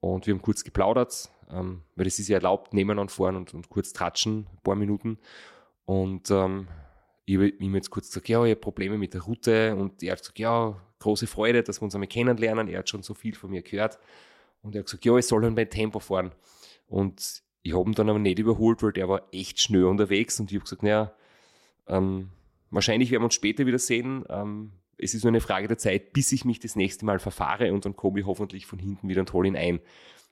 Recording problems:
none

